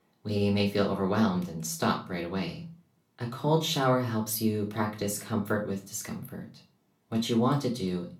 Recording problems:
off-mic speech; far
room echo; very slight; dies away in 0.3 s

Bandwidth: 18.5 kHz